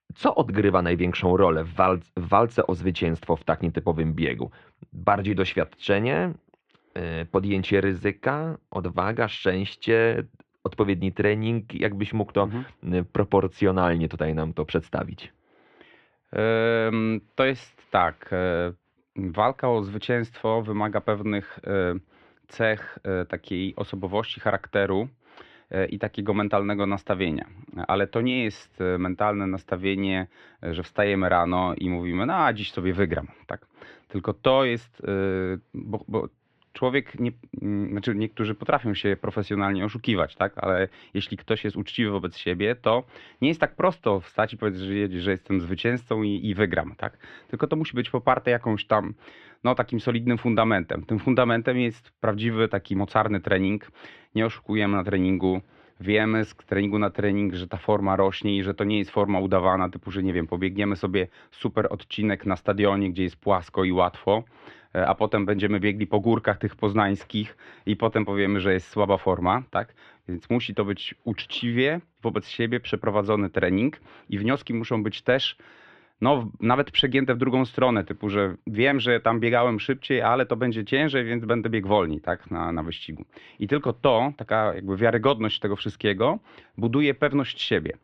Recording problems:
muffled; very; fading above 3 kHz

